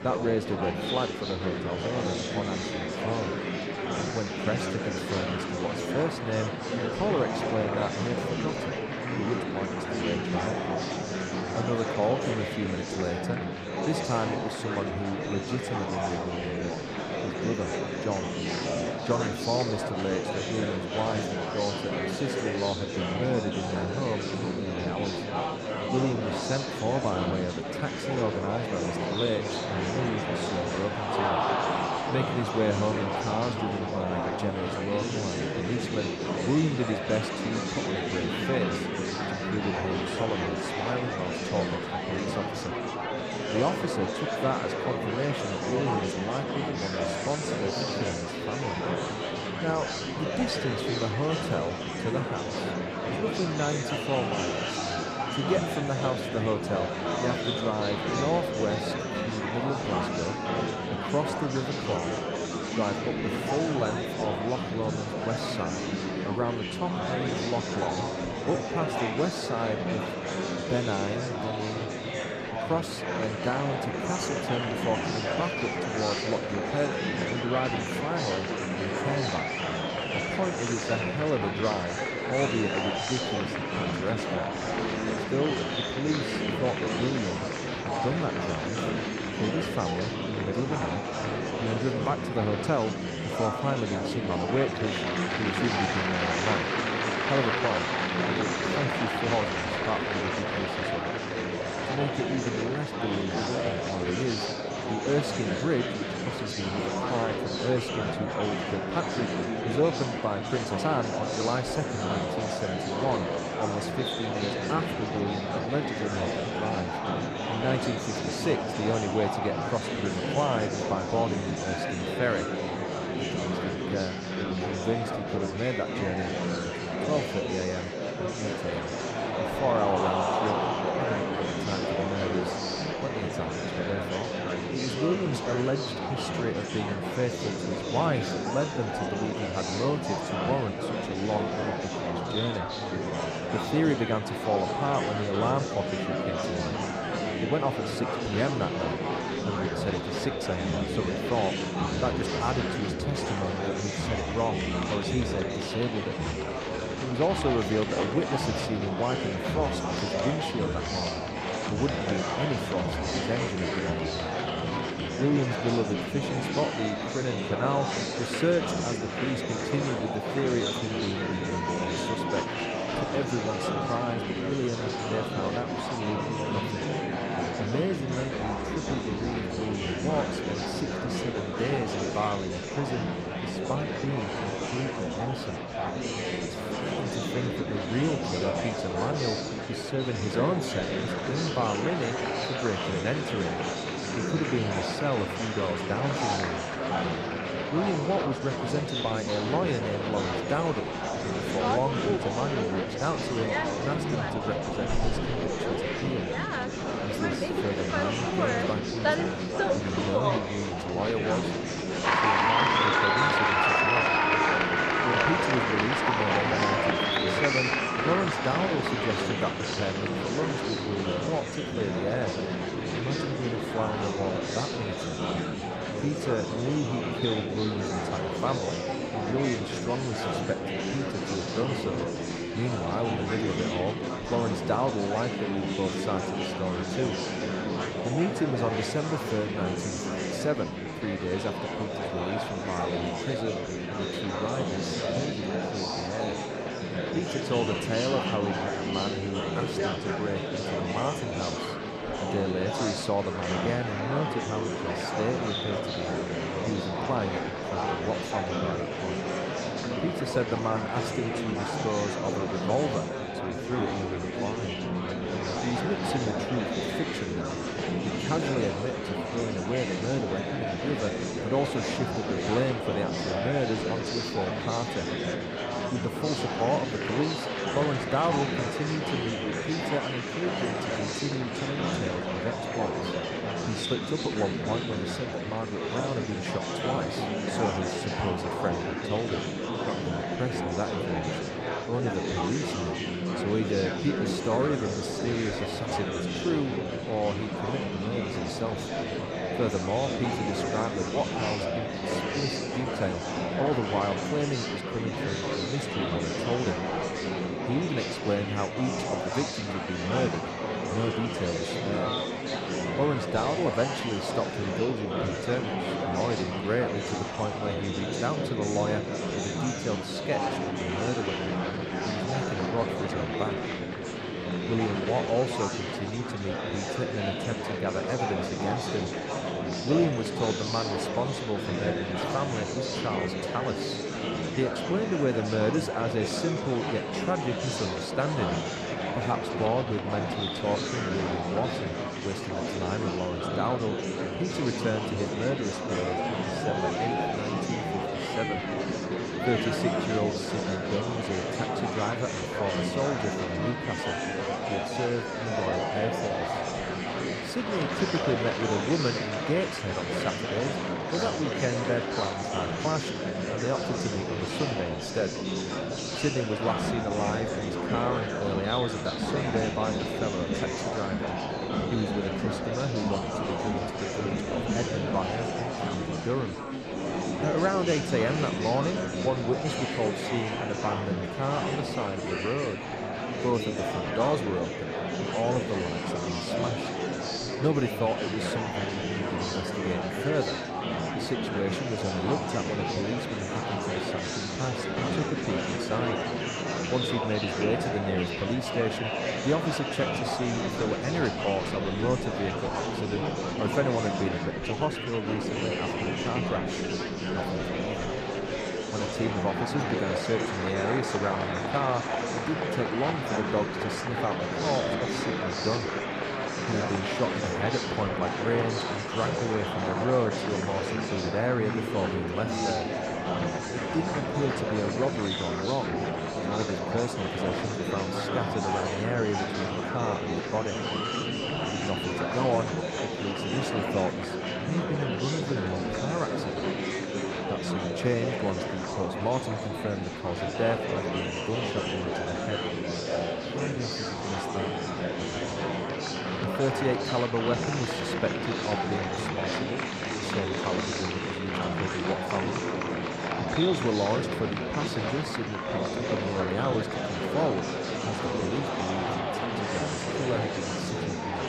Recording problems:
murmuring crowd; very loud; throughout; 2 dB above the speech

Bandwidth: 15 kHz